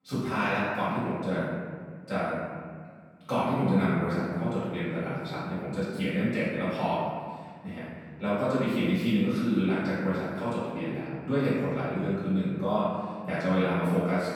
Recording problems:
room echo; strong; dies away in 1.7 s
off-mic speech; far

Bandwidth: 18.5 kHz